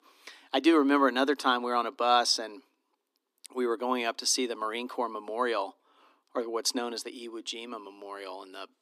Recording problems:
thin; somewhat; fading below 250 Hz

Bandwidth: 14.5 kHz